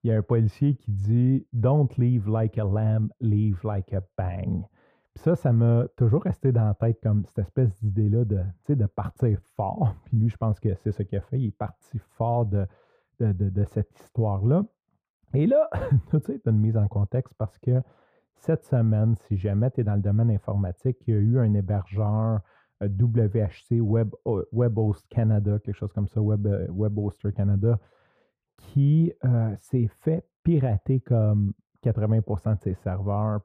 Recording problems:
muffled; very; fading above 2 kHz

